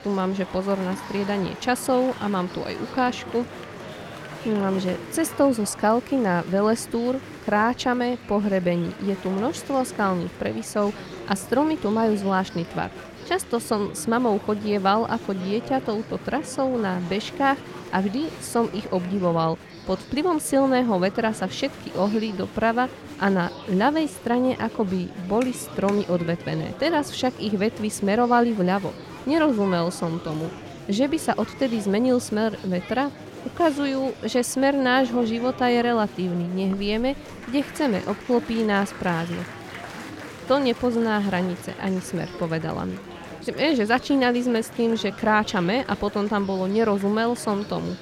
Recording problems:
murmuring crowd; noticeable; throughout; 15 dB below the speech

